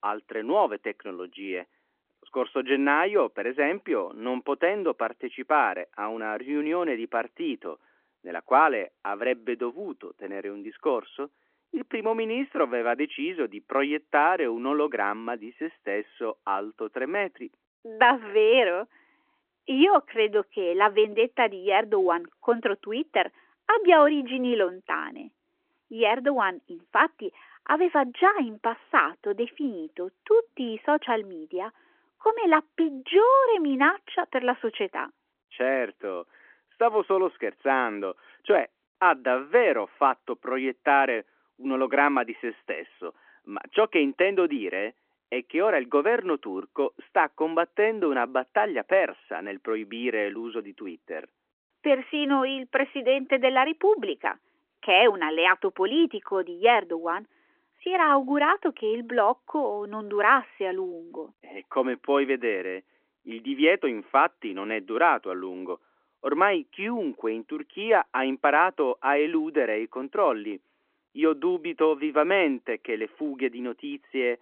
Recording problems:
phone-call audio; nothing above 3.5 kHz

